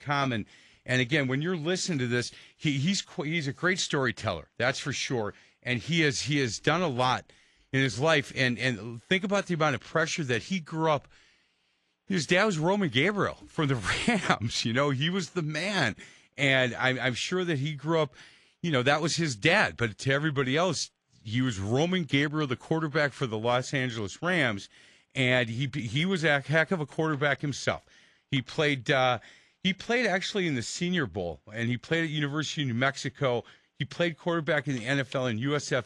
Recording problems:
garbled, watery; slightly

